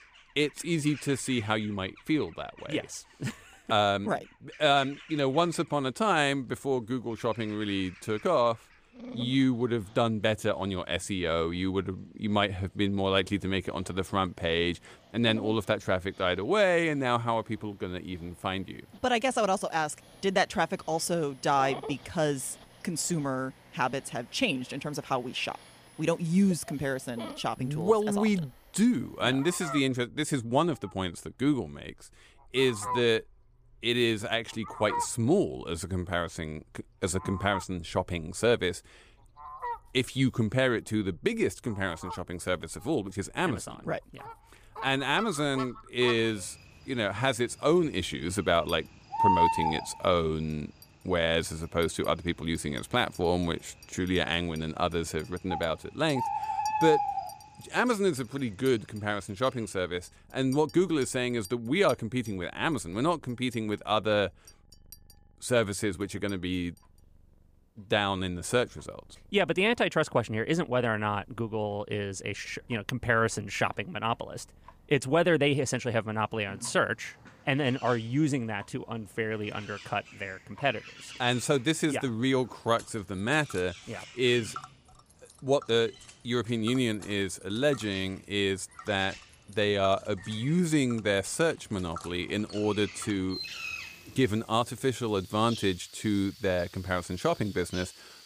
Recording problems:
animal sounds; loud; throughout; 9 dB below the speech
household noises; faint; throughout; 25 dB below the speech

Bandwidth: 15 kHz